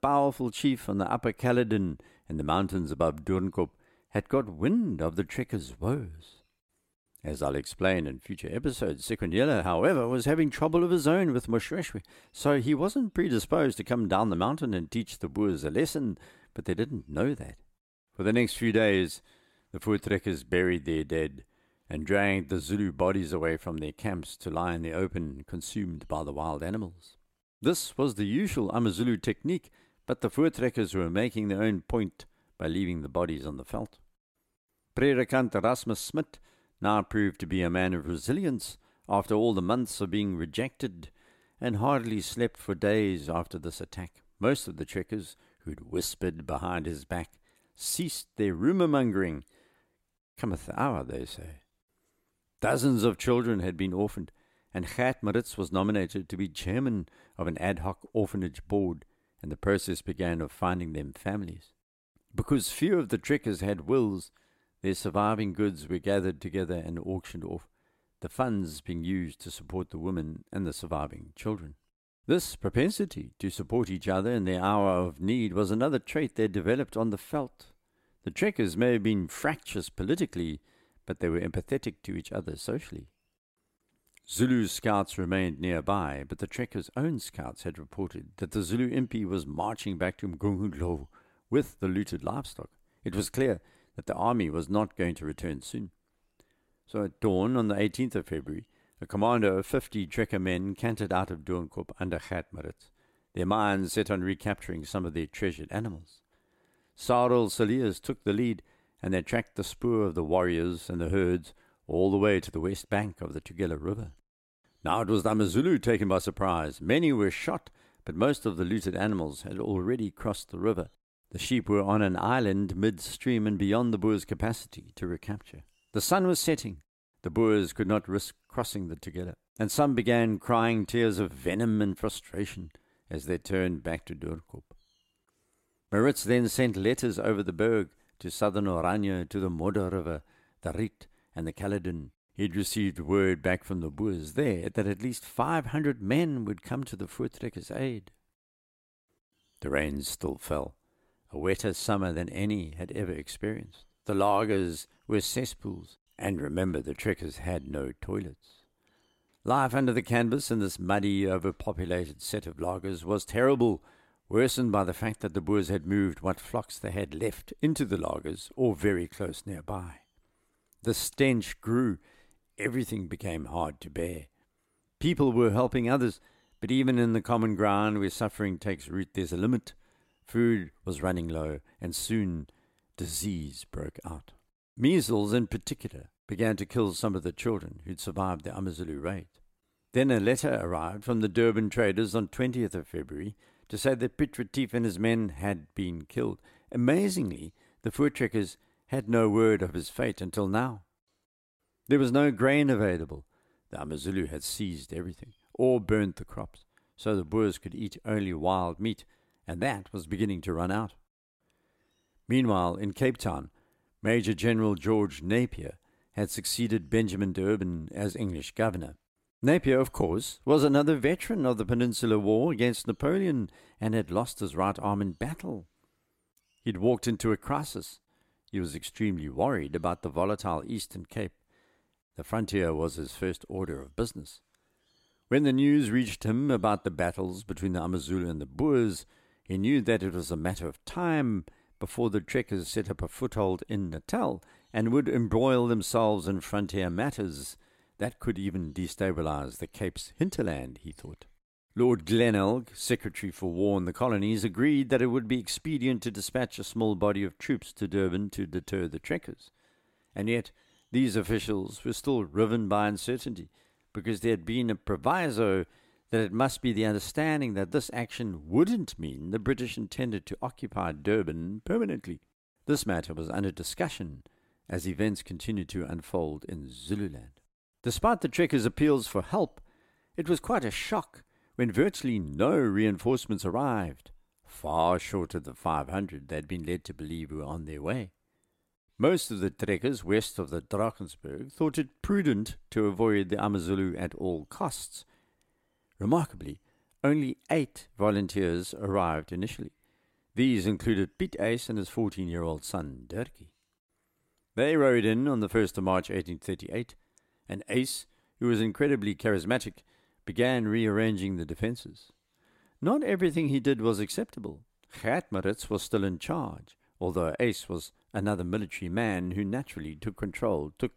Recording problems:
none

